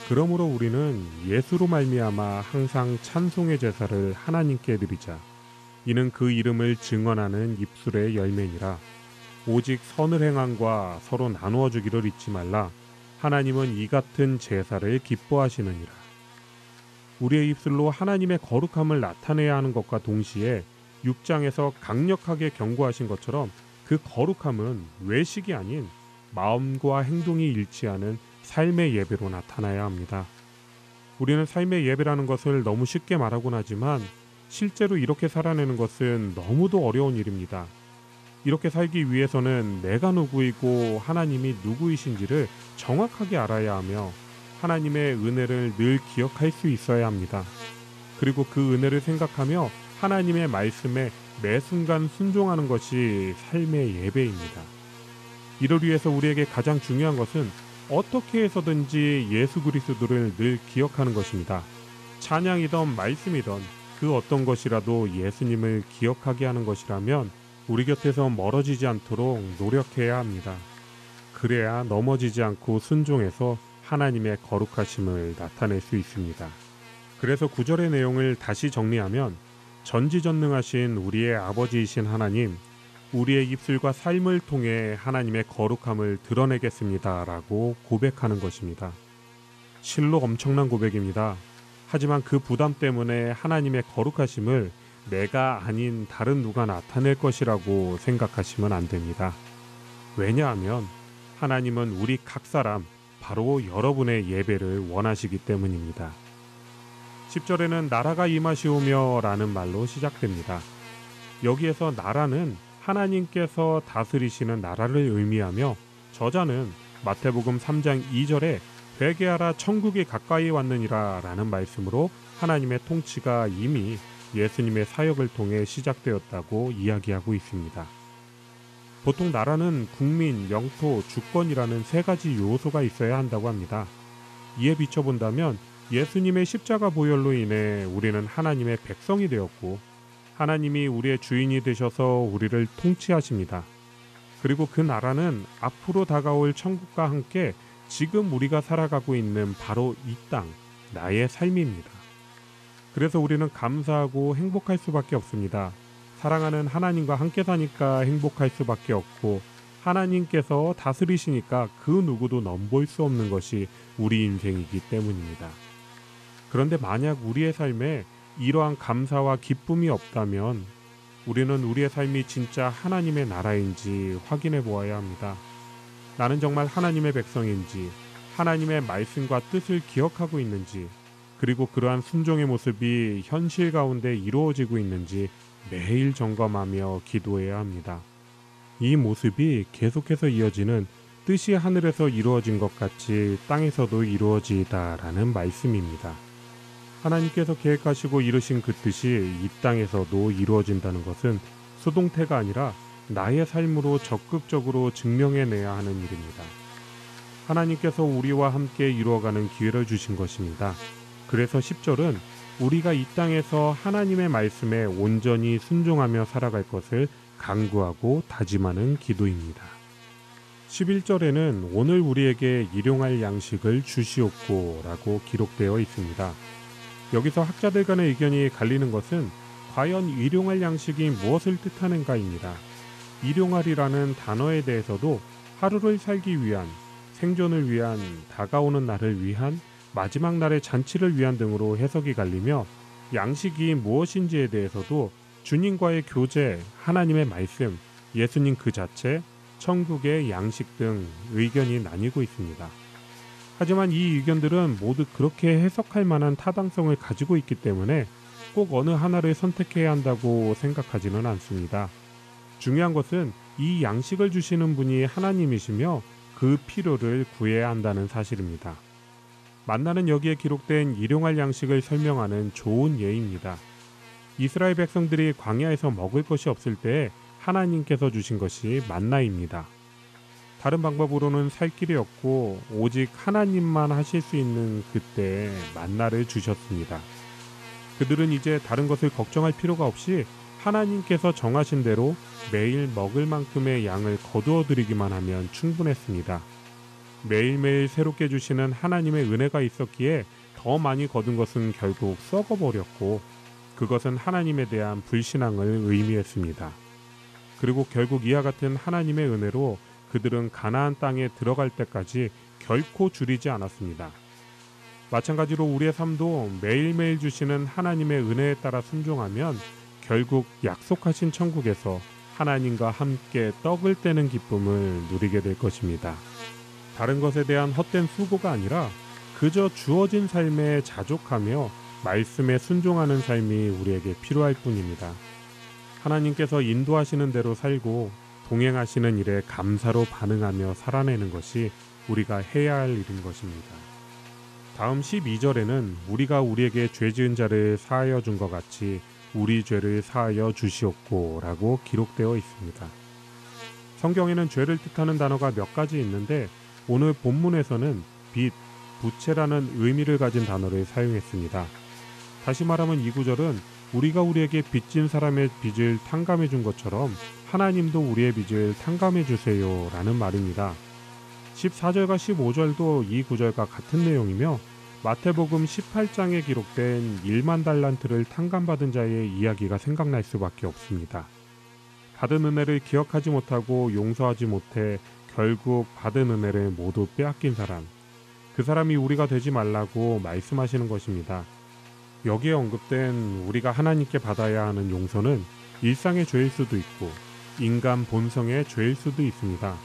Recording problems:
electrical hum; noticeable; throughout; 60 Hz, 15 dB below the speech

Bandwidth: 13.5 kHz